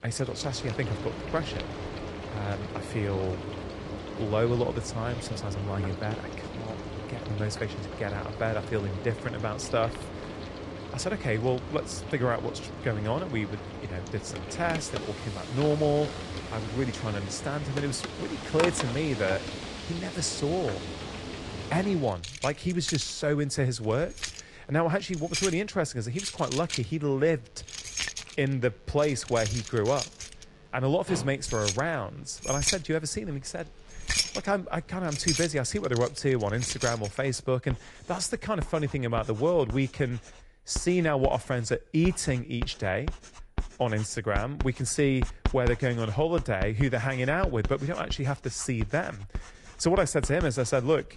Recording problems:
garbled, watery; slightly; nothing above 10 kHz
household noises; loud; throughout; 7 dB below the speech

